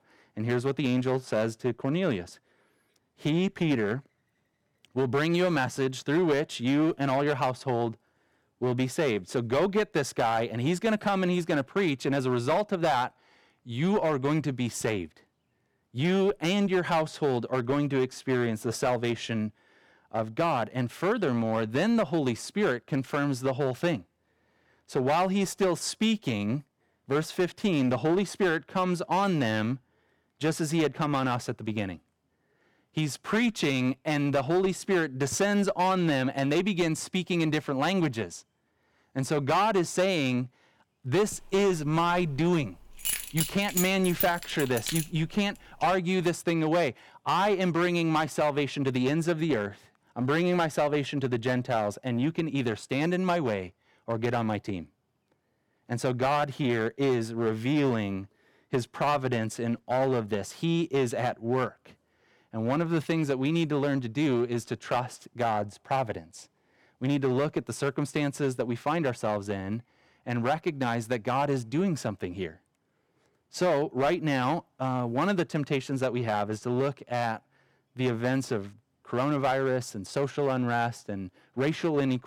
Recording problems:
distortion; slight; 7% of the sound clipped
jangling keys; noticeable; from 42 to 46 s; peak 1 dB below the speech

